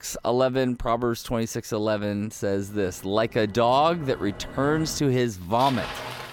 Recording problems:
traffic noise; noticeable; throughout; 15 dB below the speech

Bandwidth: 17 kHz